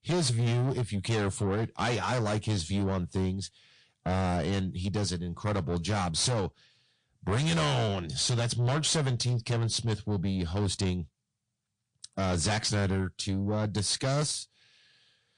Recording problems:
distortion; heavy; 7 dB below the speech
garbled, watery; slightly; nothing above 9 kHz

